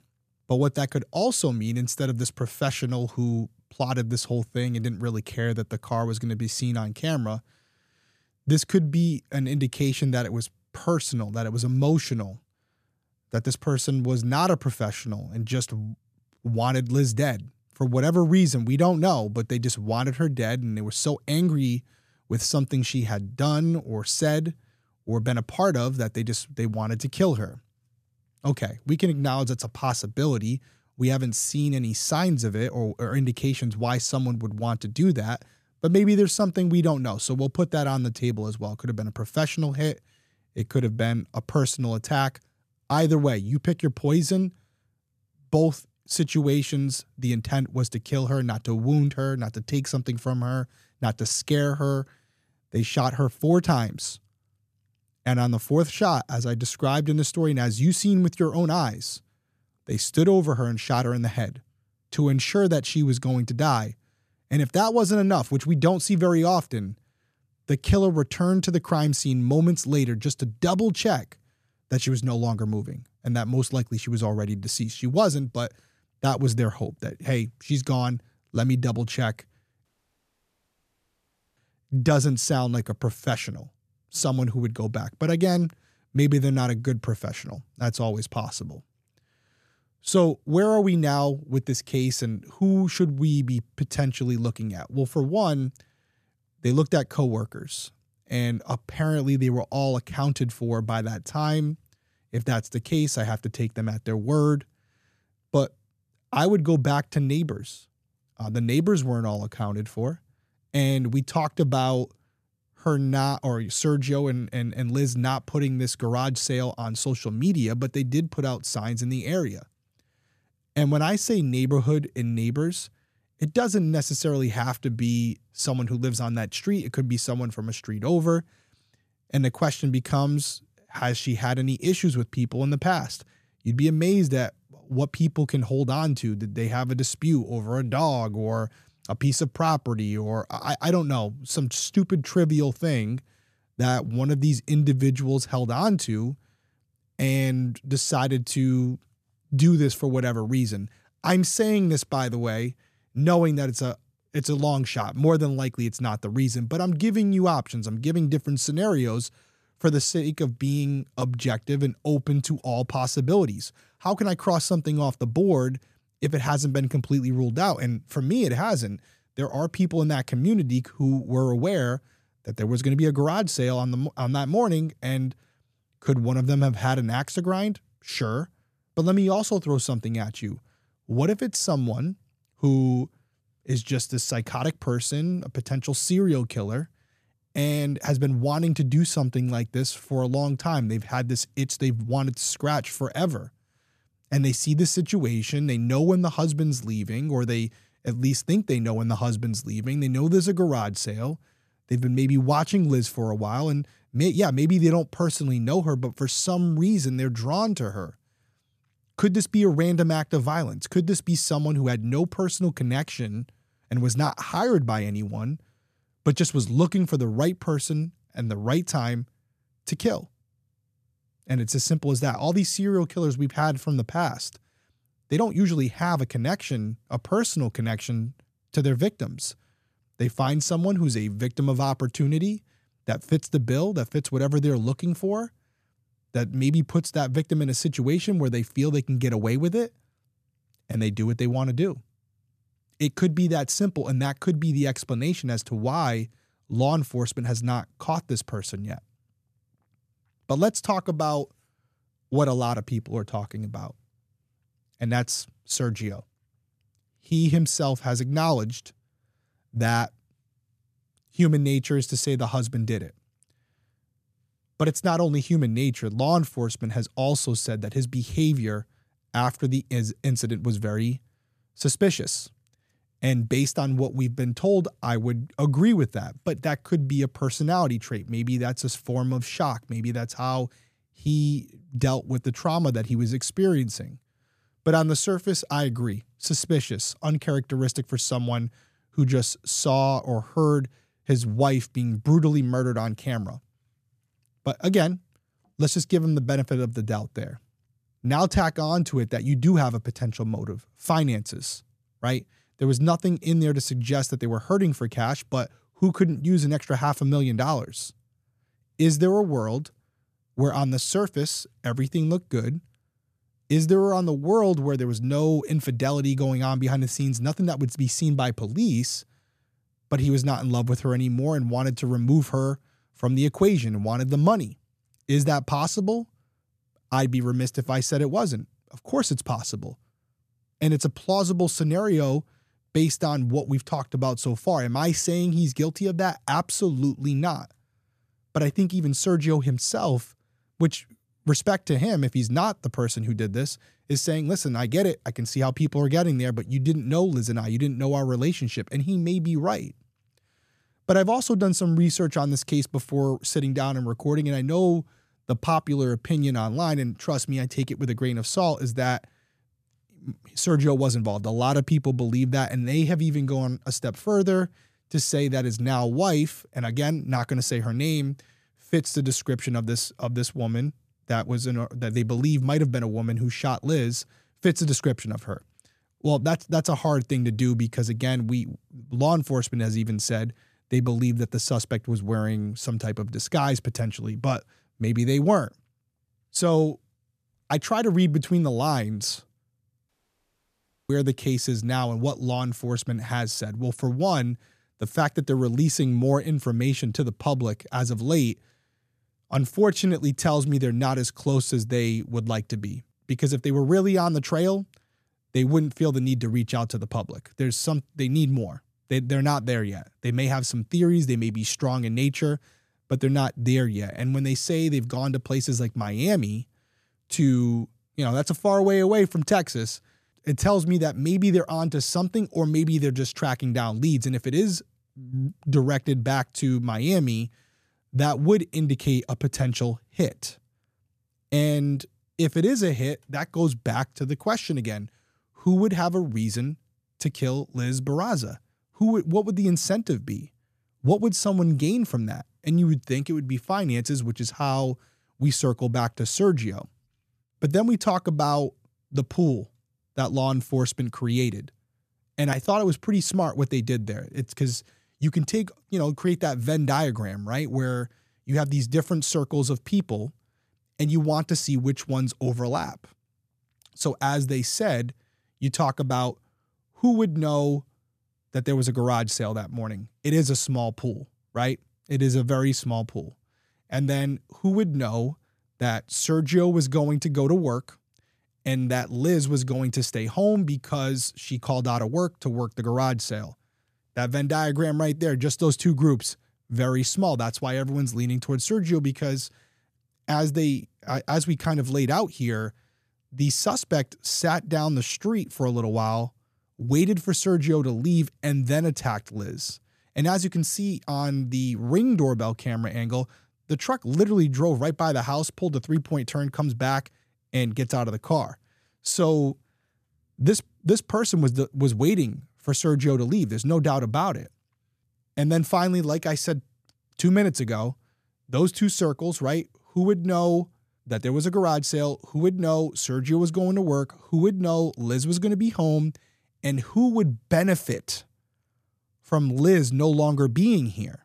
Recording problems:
audio cutting out; at 1:20 for 1.5 s and at 6:30 for 1 s

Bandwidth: 14.5 kHz